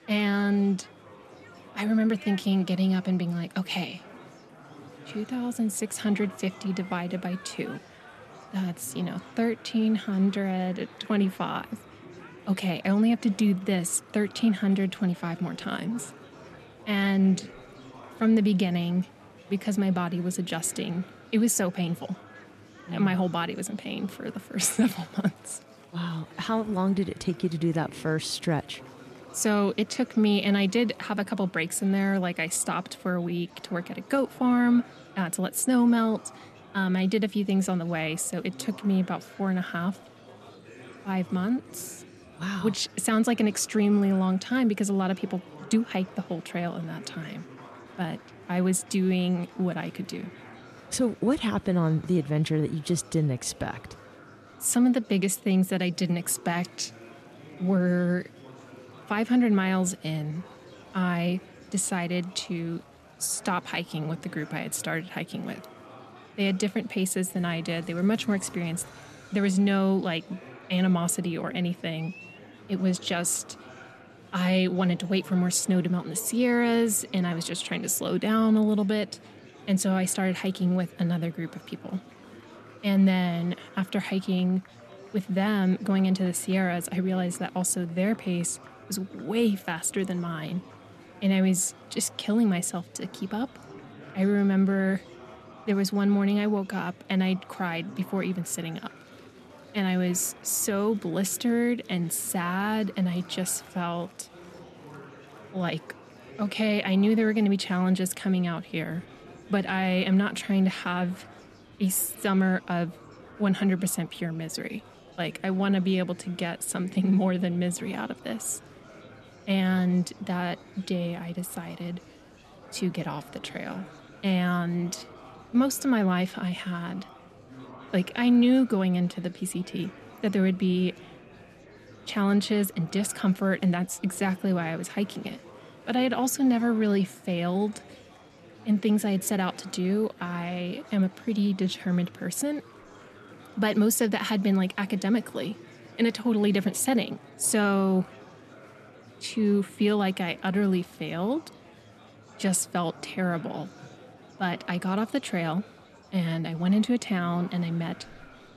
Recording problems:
murmuring crowd; faint; throughout; 20 dB below the speech

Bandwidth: 13.5 kHz